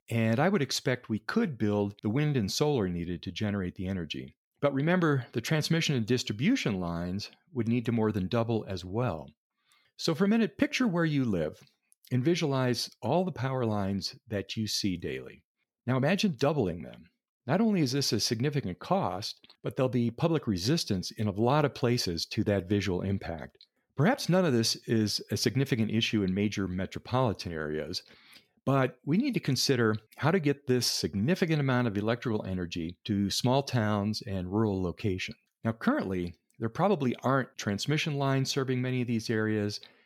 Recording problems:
none

